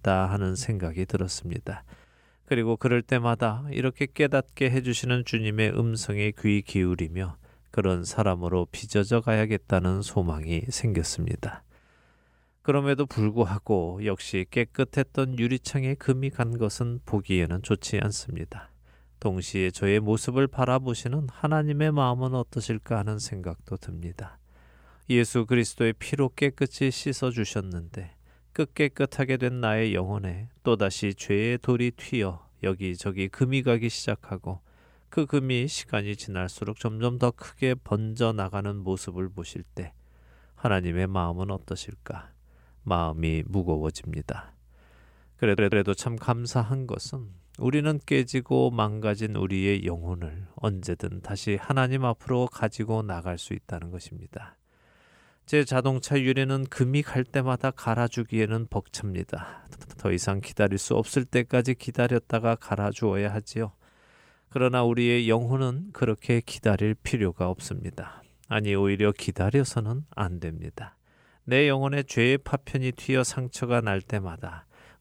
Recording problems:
audio stuttering; at 45 s and at 1:00

